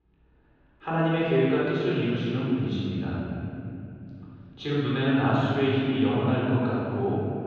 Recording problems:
room echo; strong; dies away in 3 s
off-mic speech; far
muffled; very; fading above 3.5 kHz

